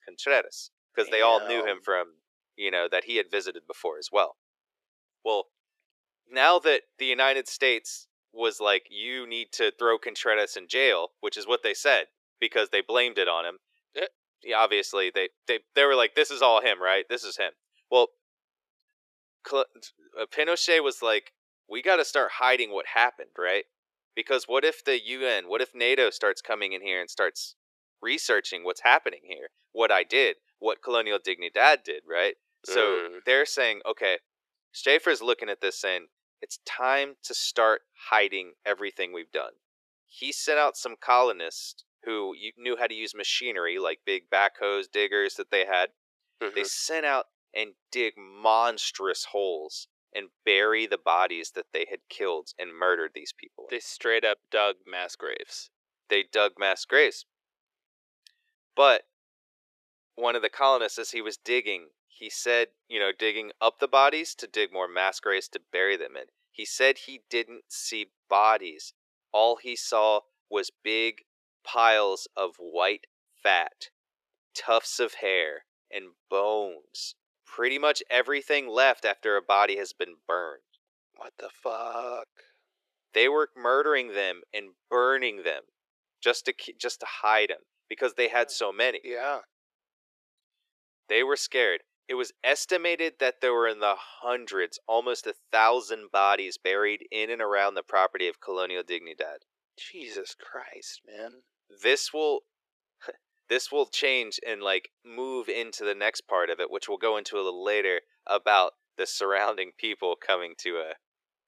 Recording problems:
thin; very; fading below 400 Hz

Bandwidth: 13.5 kHz